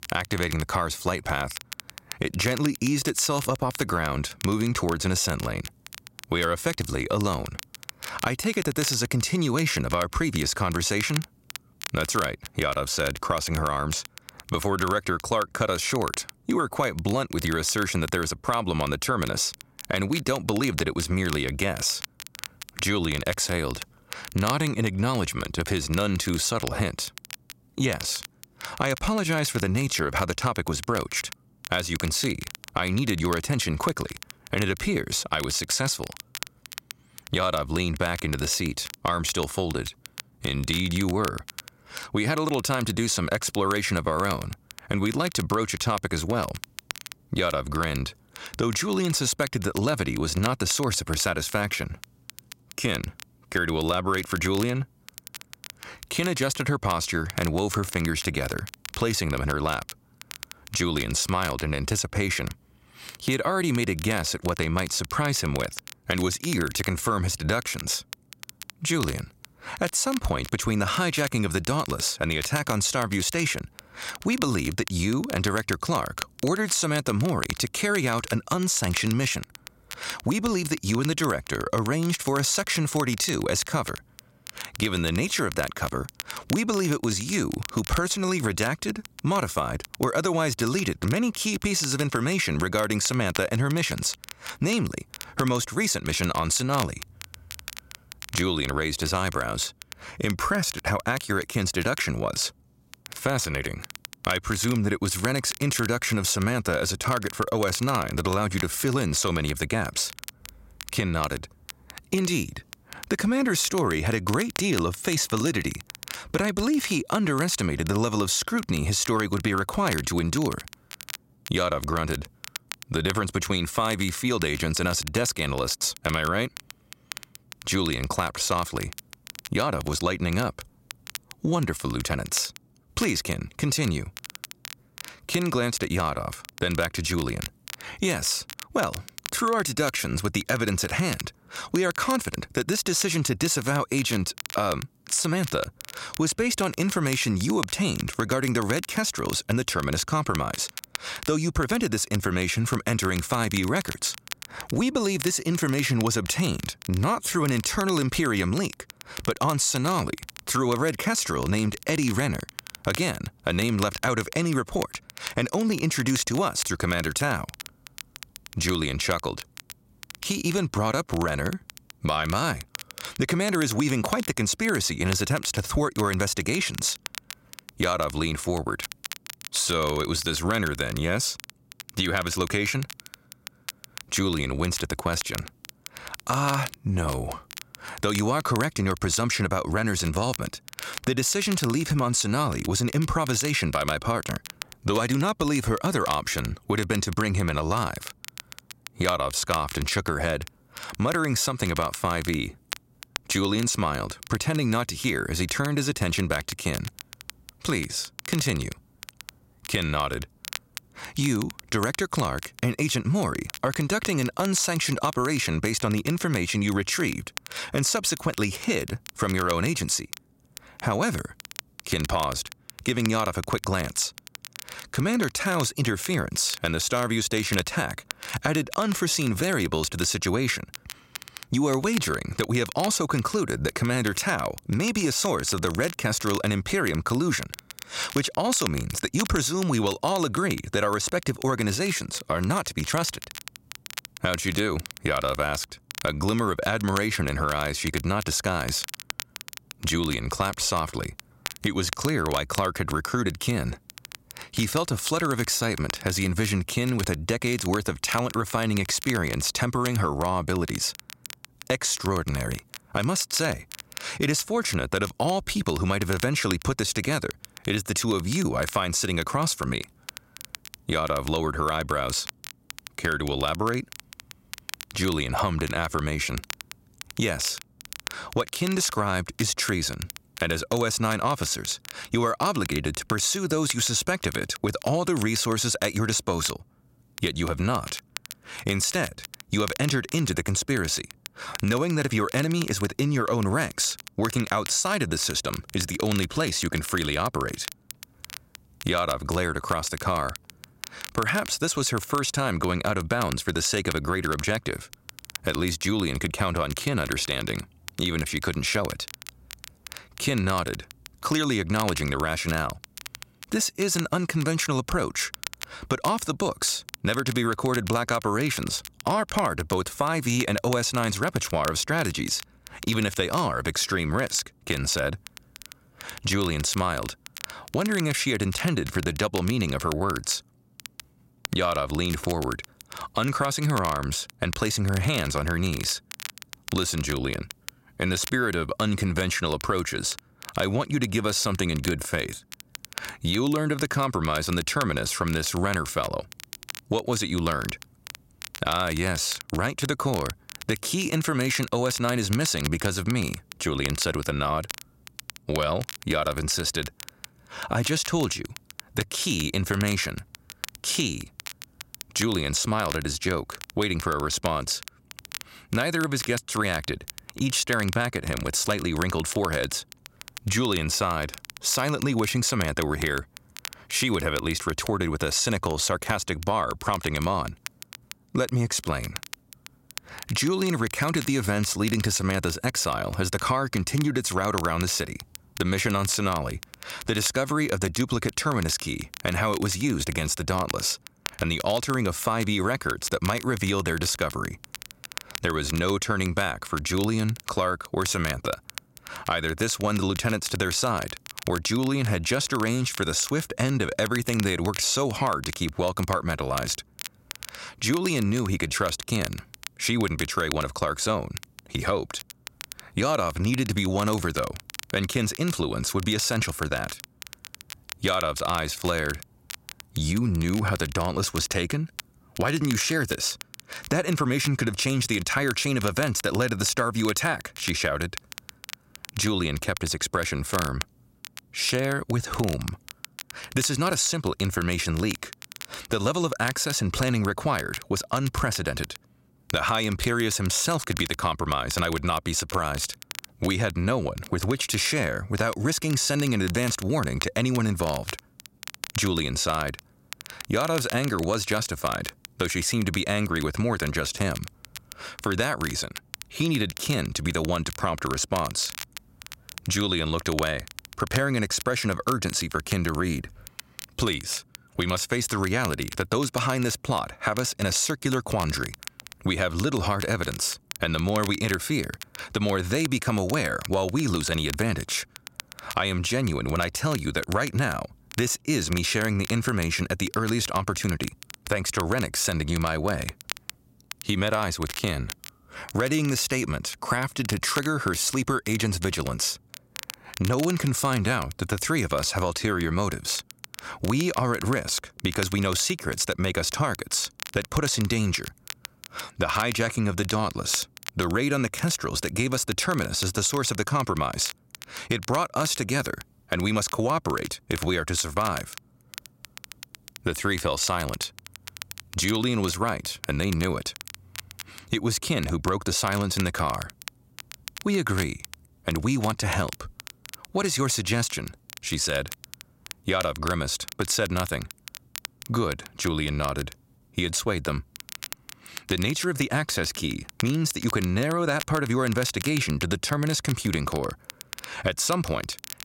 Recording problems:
squashed, flat; somewhat
crackle, like an old record; noticeable; 15 dB below the speech

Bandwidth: 16 kHz